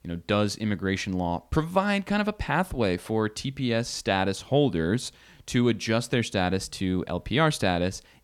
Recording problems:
none

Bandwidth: 17.5 kHz